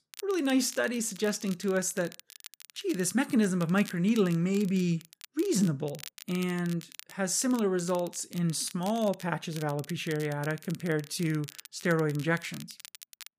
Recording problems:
crackle, like an old record; noticeable; 20 dB below the speech

